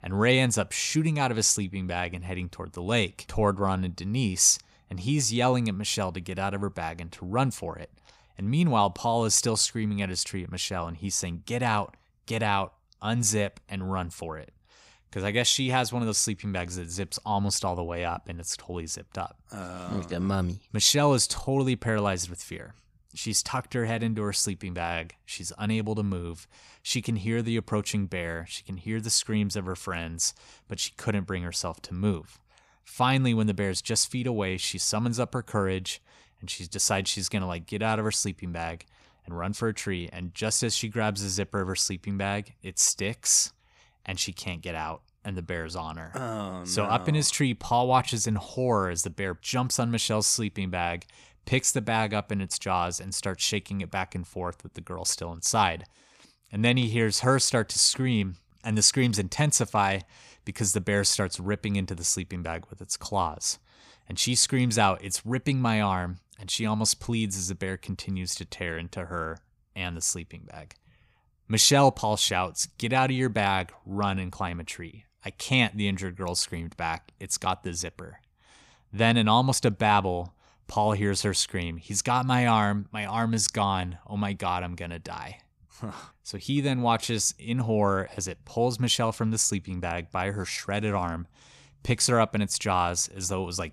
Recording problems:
none

